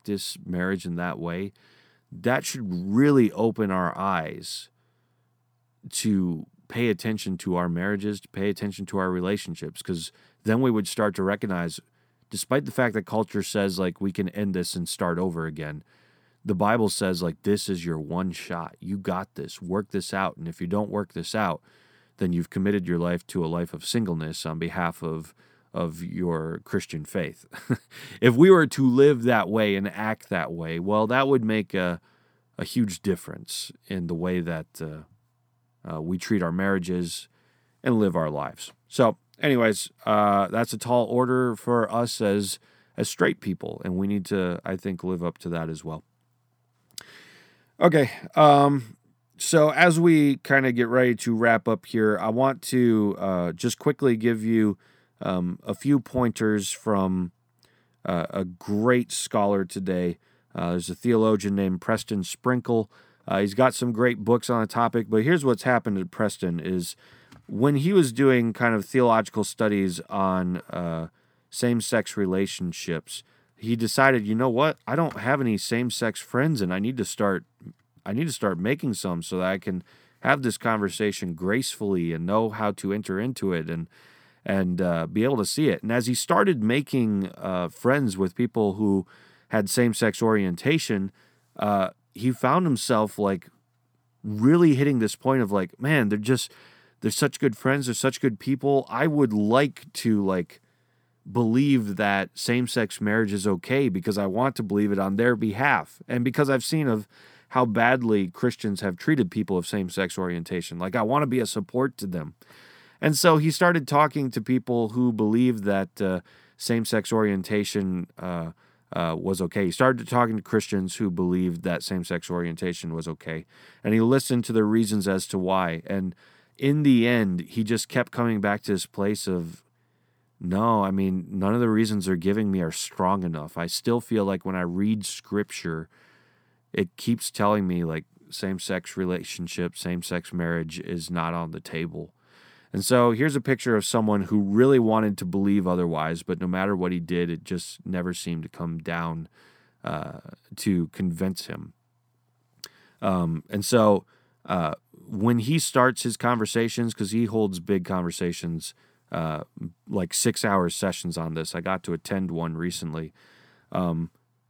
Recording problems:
none

